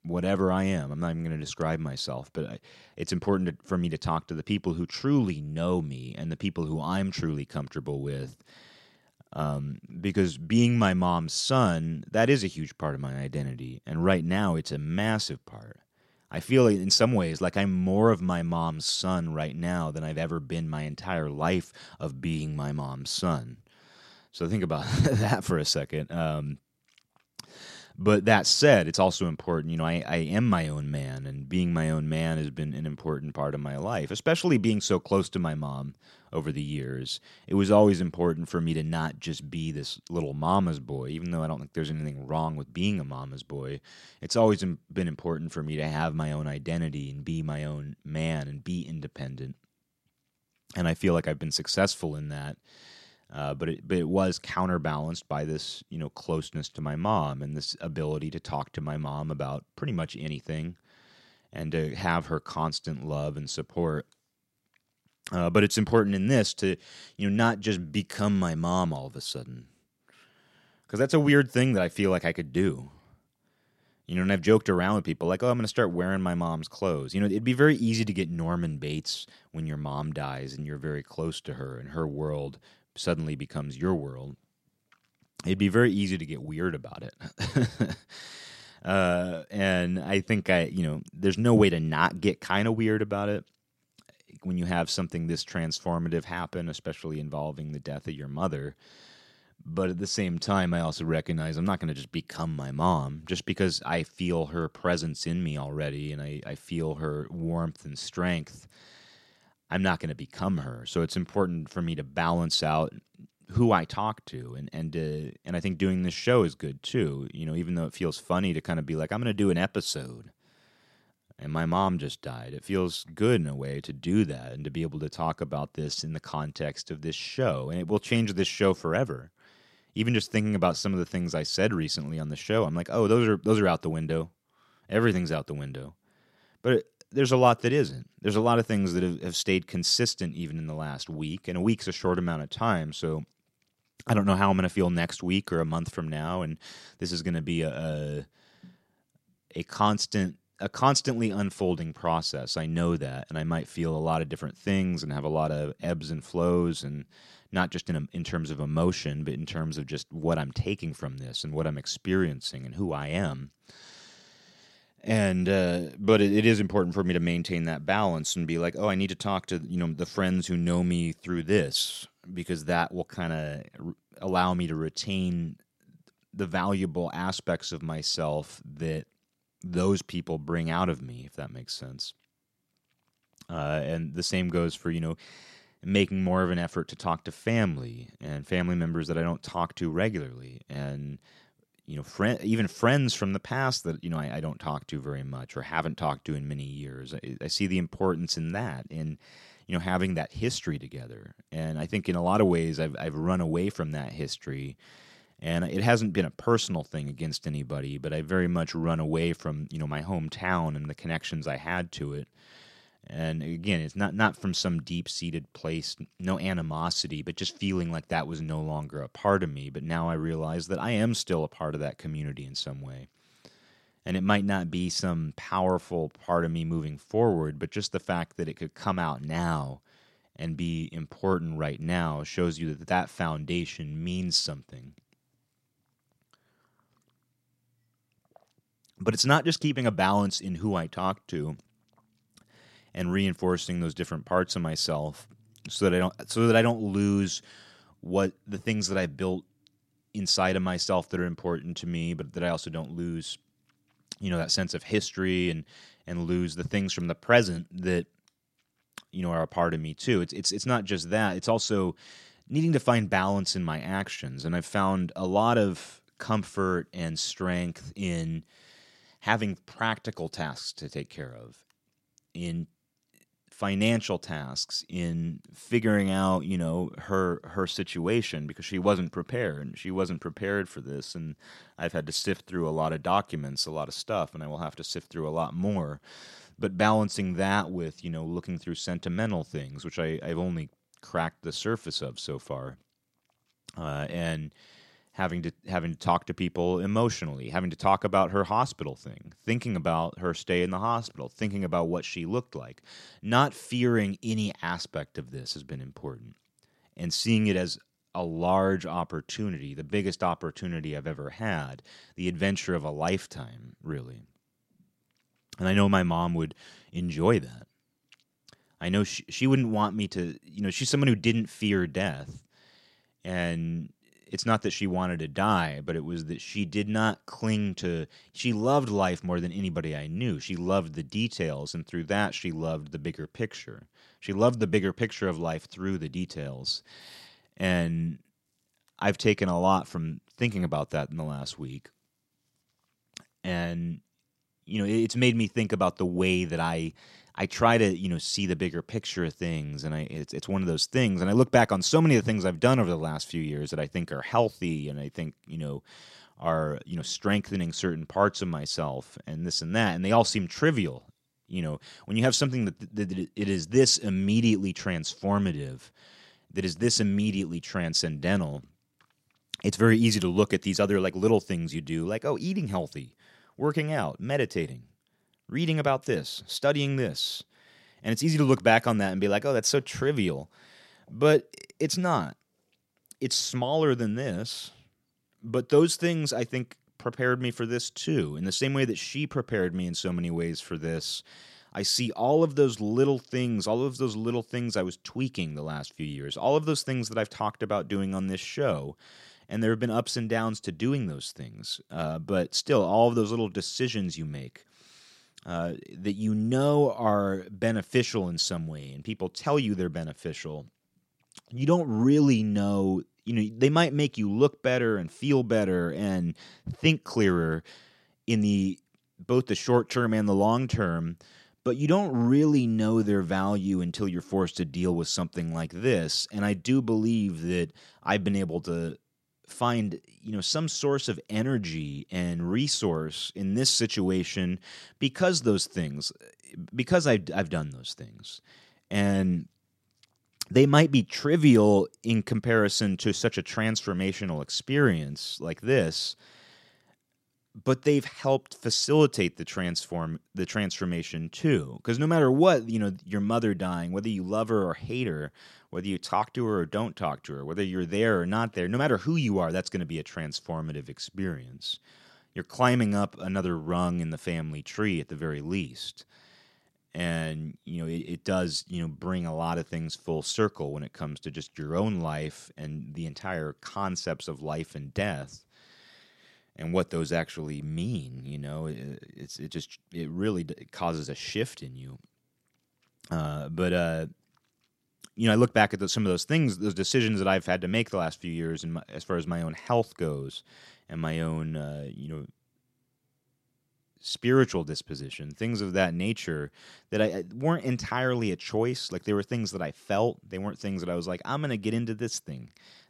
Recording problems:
none

